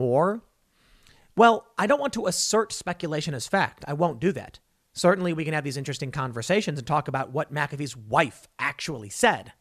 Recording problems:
abrupt cut into speech; at the start

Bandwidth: 14 kHz